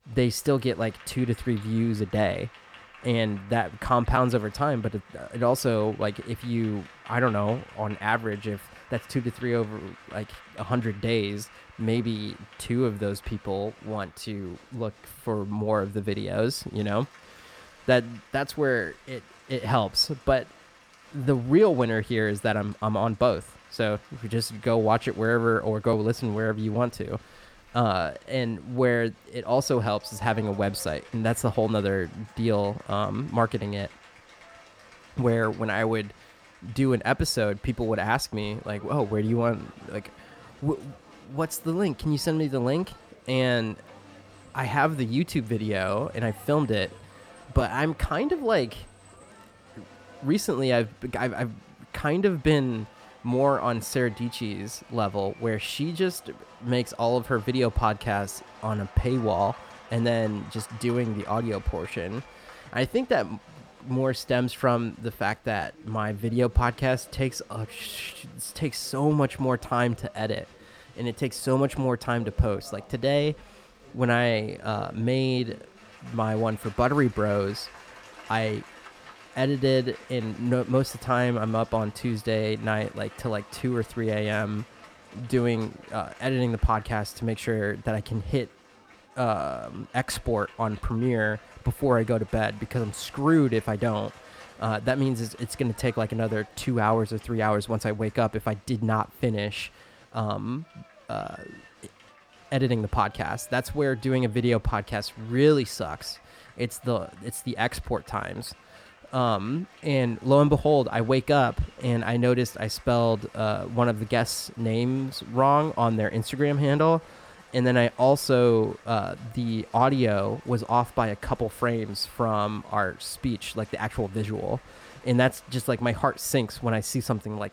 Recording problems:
crowd noise; faint; throughout; 25 dB below the speech

